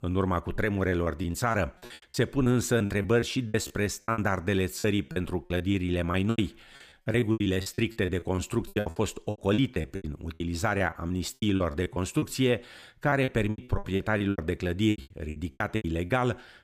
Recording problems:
choppy; very; 18% of the speech affected

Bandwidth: 15 kHz